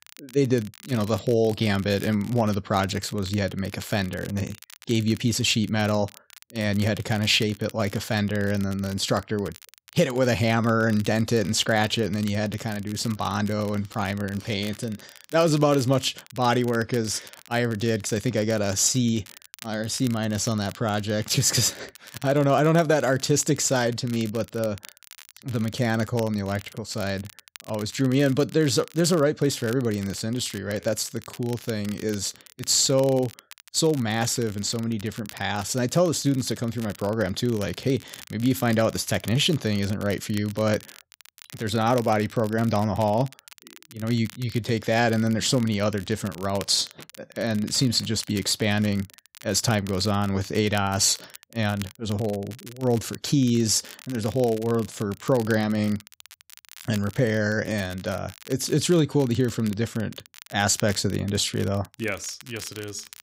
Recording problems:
crackle, like an old record; noticeable; 20 dB below the speech

